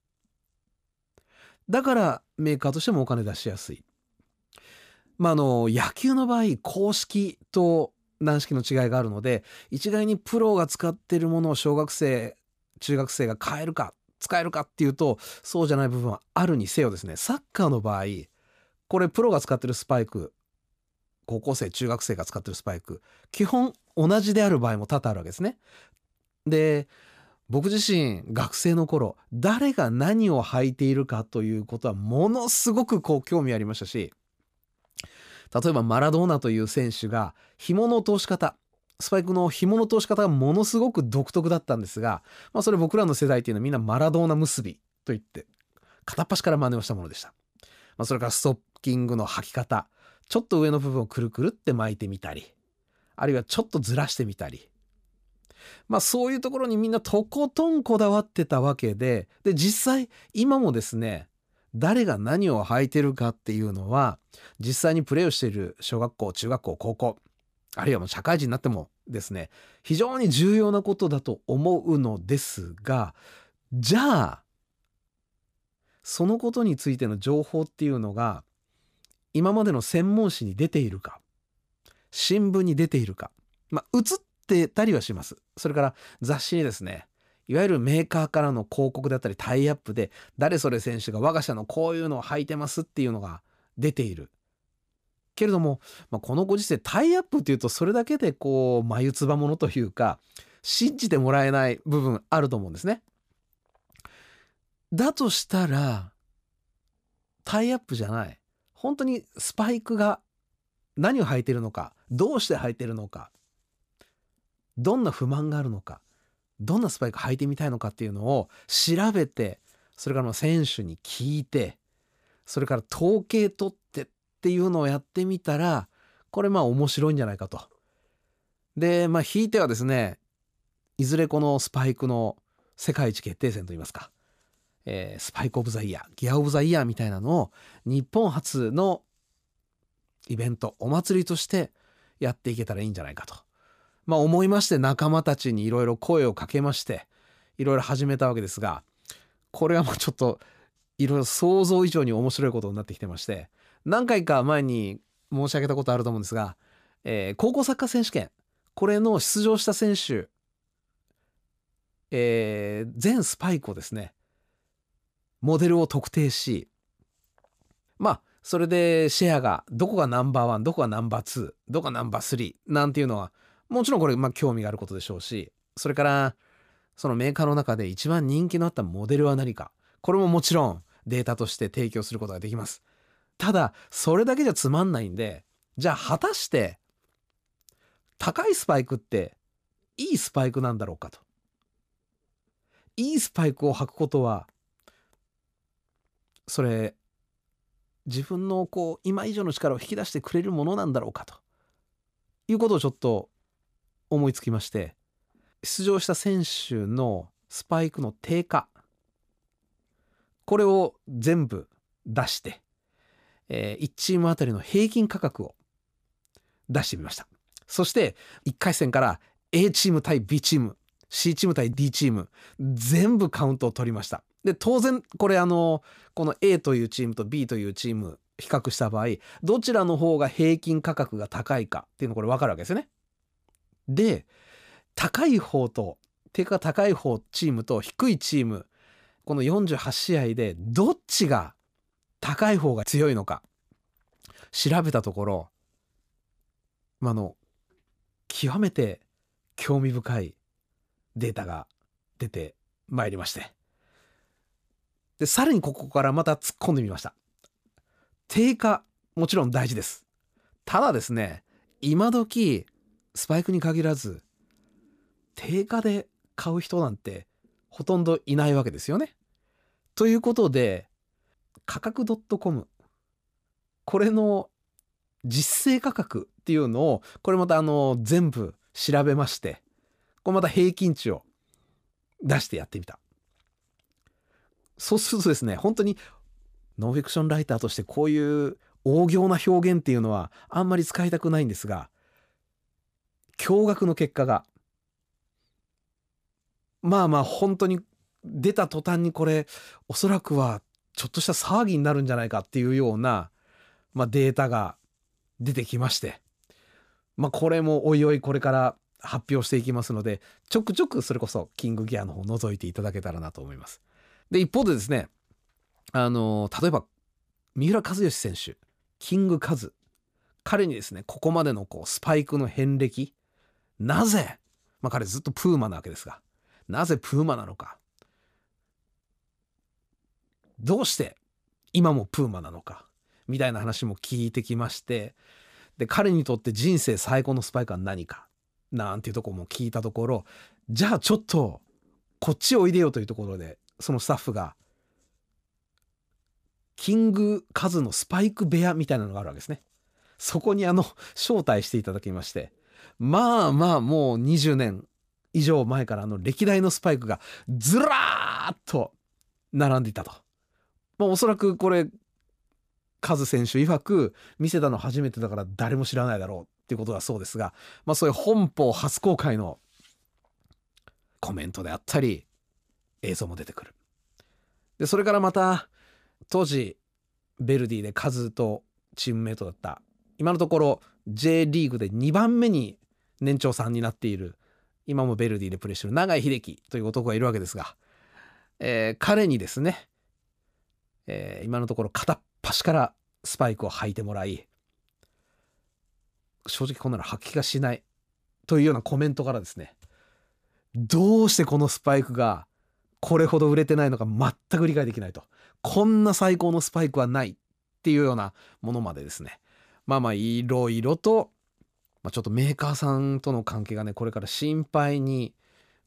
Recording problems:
none

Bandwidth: 14.5 kHz